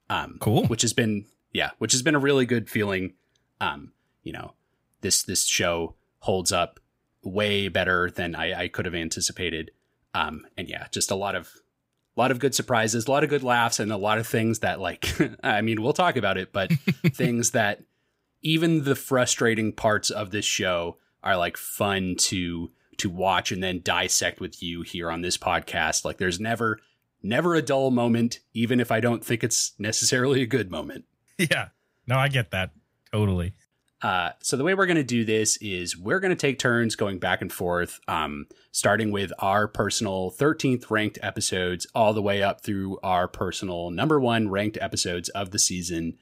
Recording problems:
none

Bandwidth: 15.5 kHz